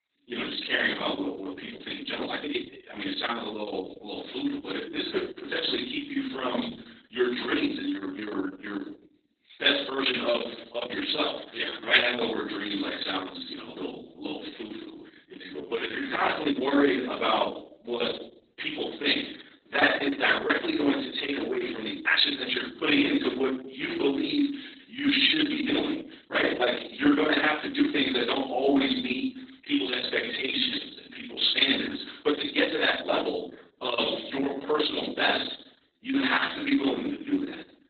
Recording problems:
off-mic speech; far
garbled, watery; badly; nothing above 4 kHz
room echo; slight; dies away in 0.5 s
thin; very slightly; fading below 250 Hz
uneven, jittery; strongly; from 1.5 to 37 s

